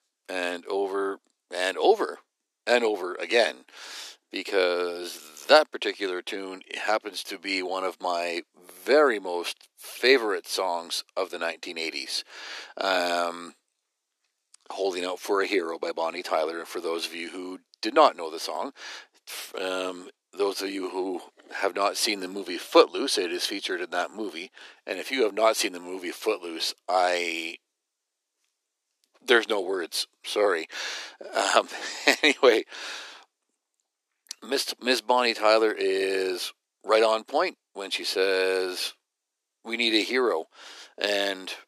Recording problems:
thin; very; fading below 300 Hz

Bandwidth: 13.5 kHz